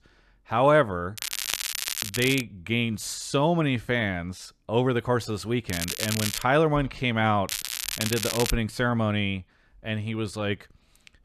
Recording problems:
crackling; loud; from 1 to 2.5 s, at 5.5 s and from 7.5 to 8.5 s; 4 dB below the speech

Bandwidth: 13.5 kHz